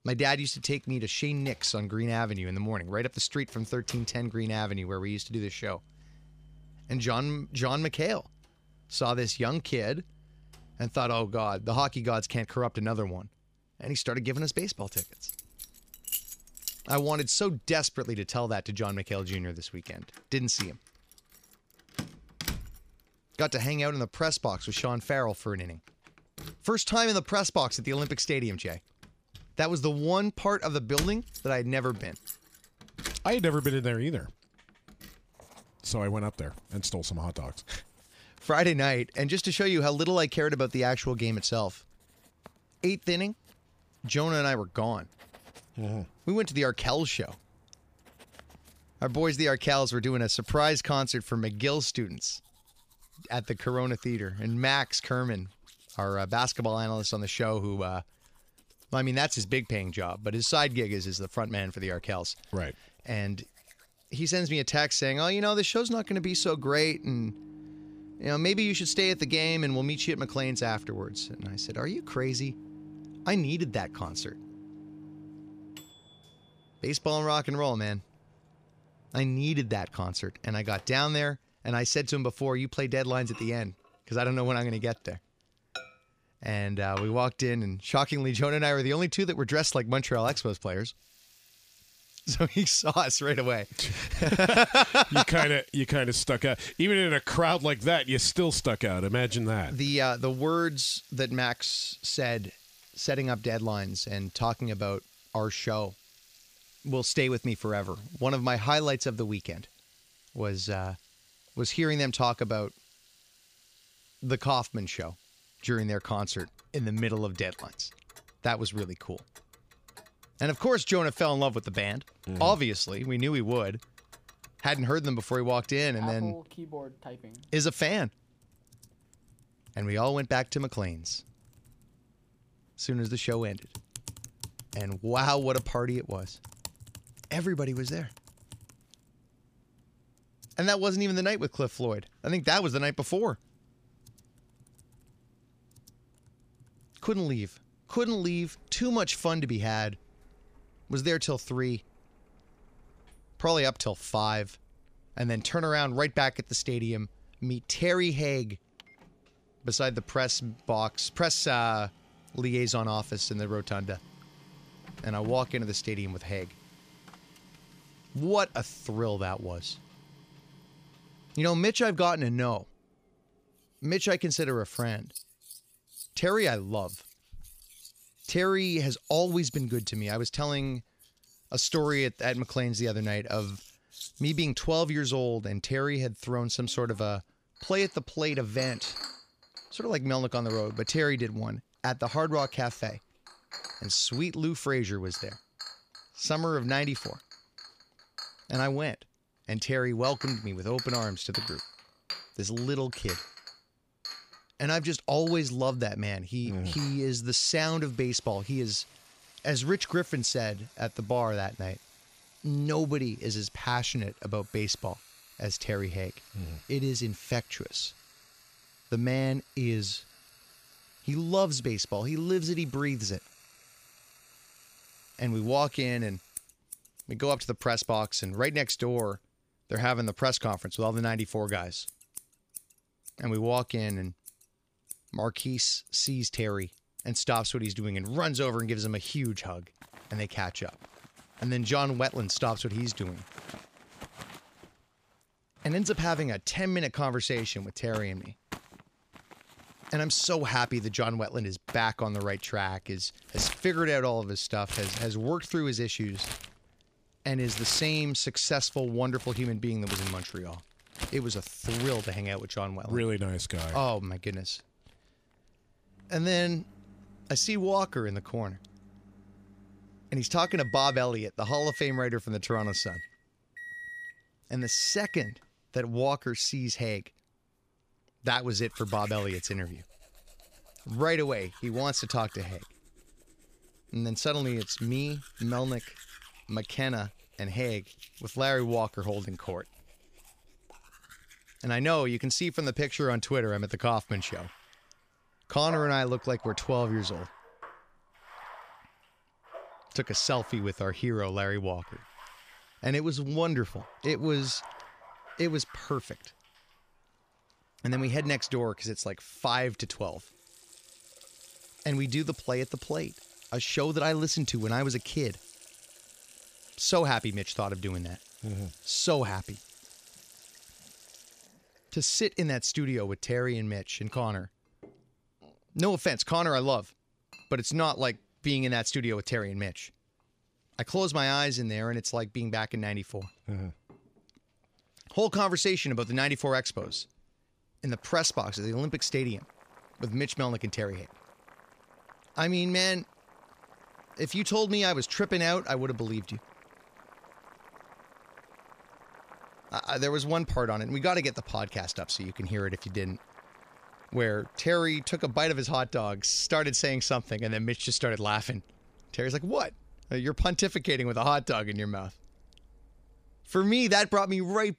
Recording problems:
household noises; noticeable; throughout; 15 dB below the speech

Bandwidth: 15 kHz